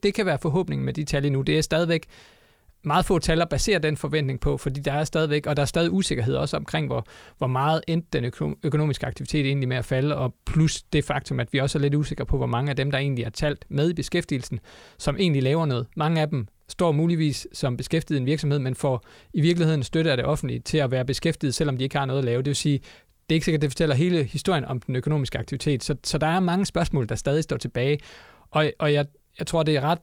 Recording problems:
none

